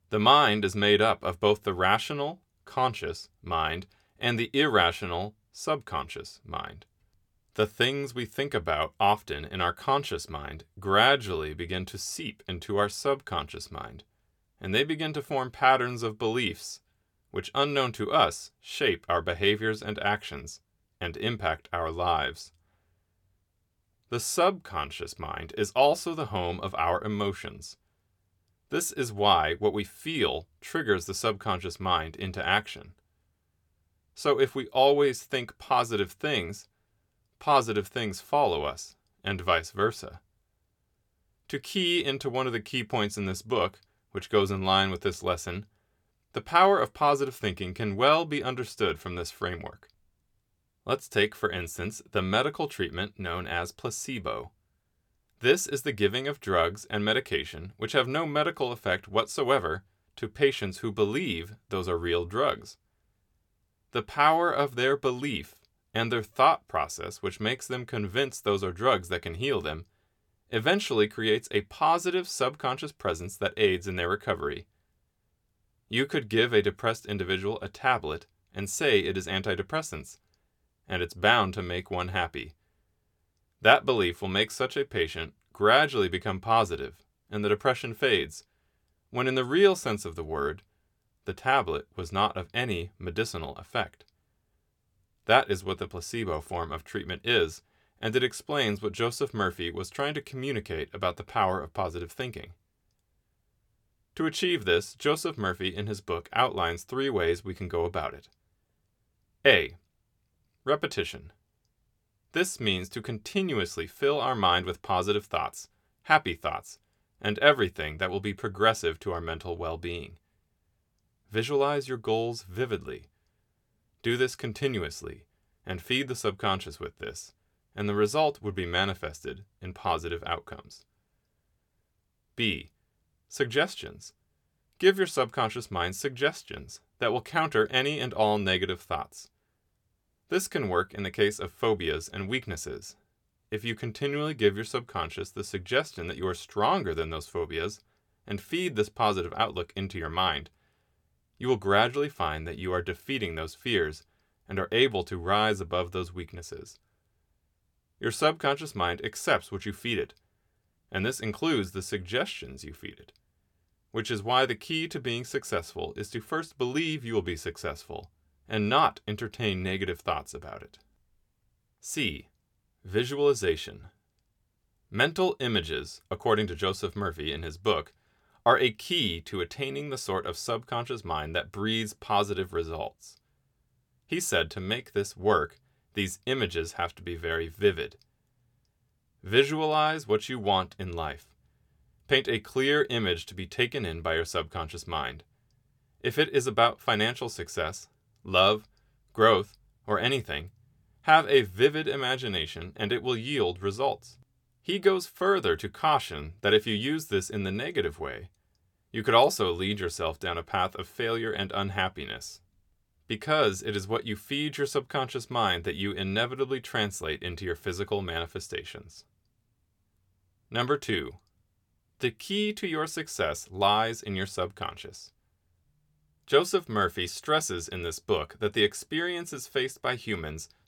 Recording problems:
none

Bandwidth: 18 kHz